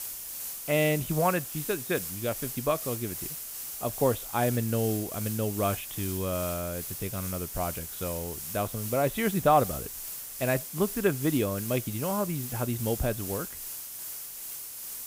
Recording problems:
high frequencies cut off; severe; nothing above 4 kHz
hiss; loud; throughout; 5 dB below the speech

